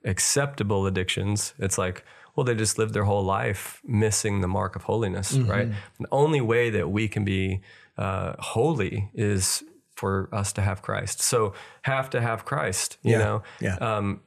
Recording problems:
none

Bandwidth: 13.5 kHz